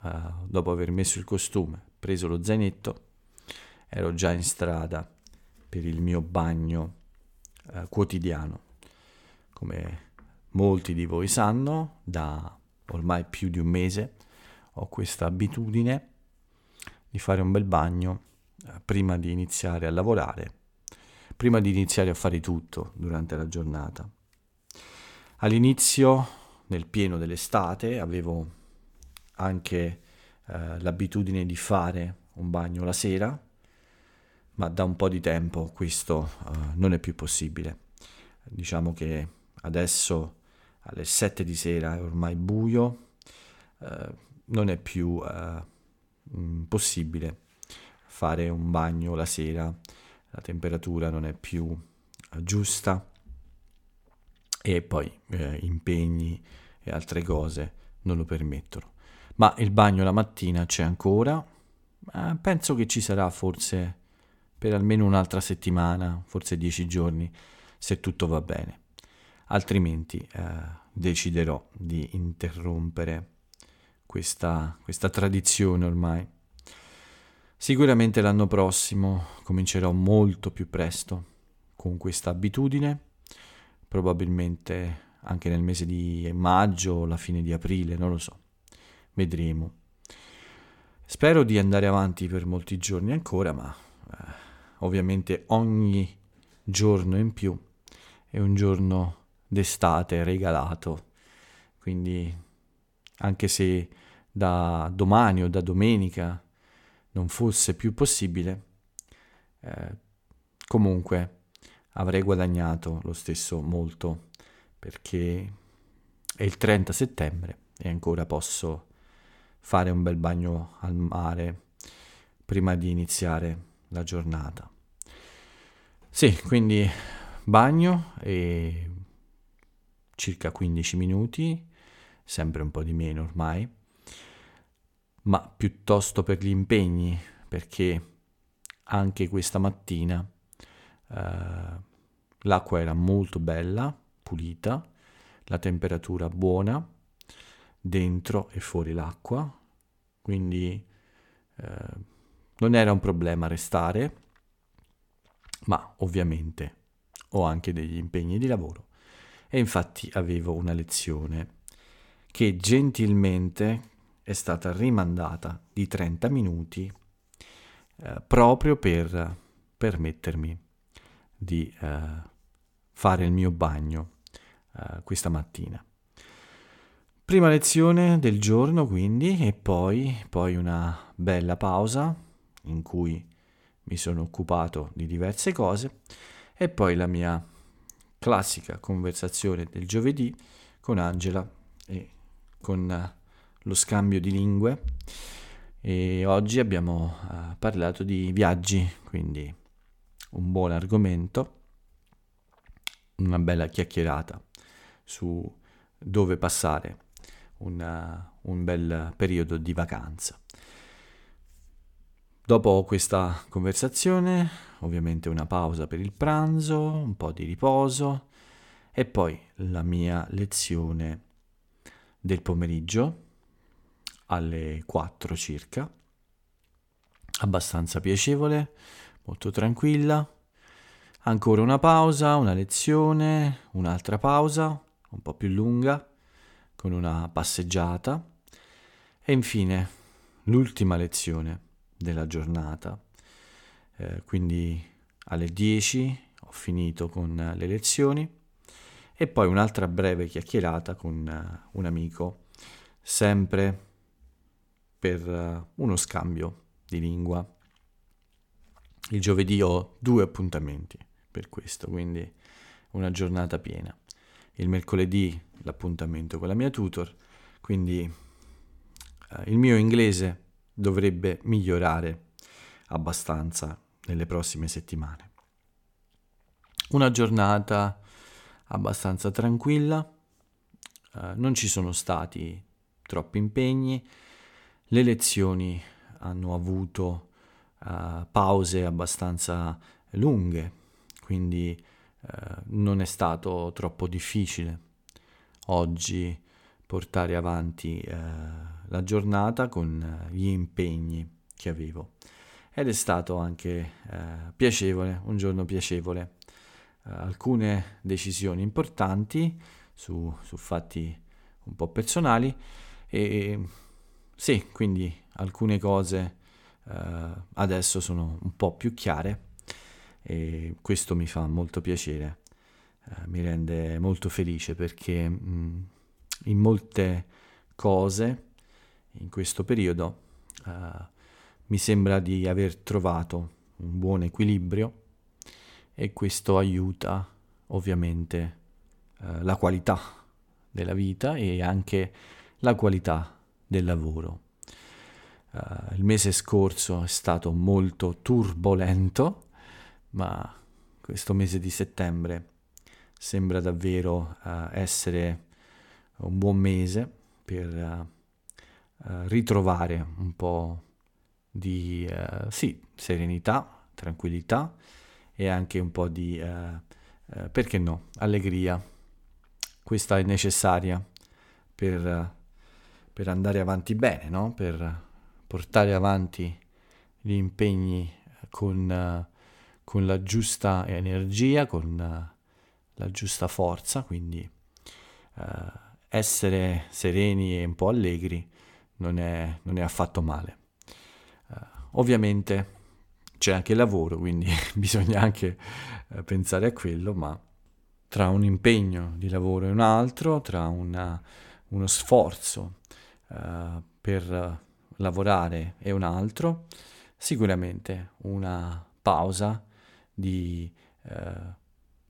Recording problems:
none

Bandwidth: 17.5 kHz